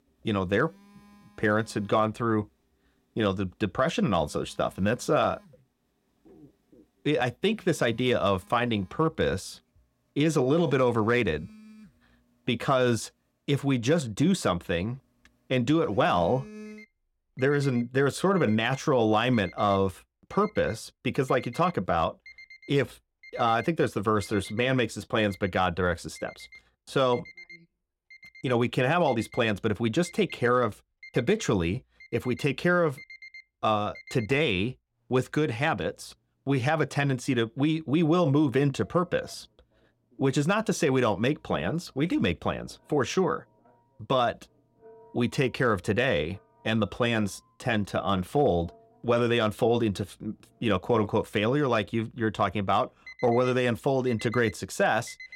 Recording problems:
alarms or sirens; faint; throughout; 25 dB below the speech

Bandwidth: 16.5 kHz